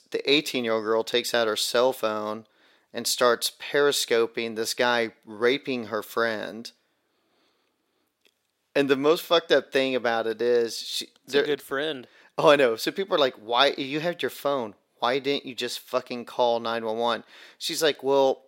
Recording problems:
thin; somewhat; fading below 400 Hz

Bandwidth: 16 kHz